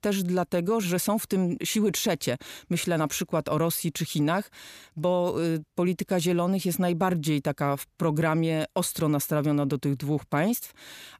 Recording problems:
none

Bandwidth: 14.5 kHz